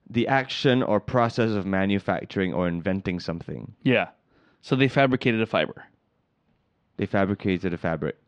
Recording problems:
muffled; very slightly; fading above 4 kHz

